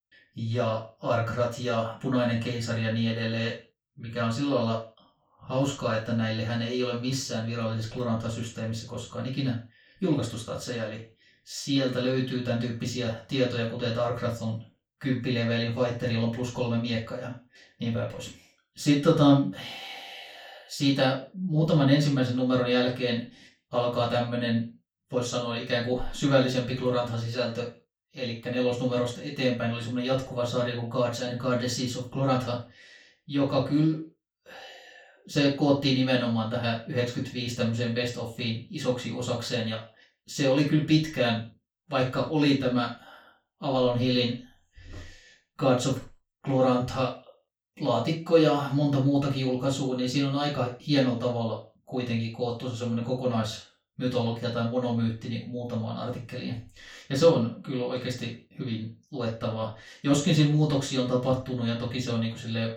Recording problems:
off-mic speech; far
room echo; noticeable; dies away in 0.3 s

